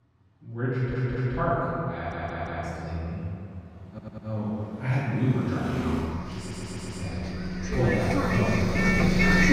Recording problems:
room echo; strong; dies away in 2.4 s
off-mic speech; far
traffic noise; very loud; throughout; 1 dB above the speech
audio stuttering; 4 times, first at 0.5 s

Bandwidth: 15.5 kHz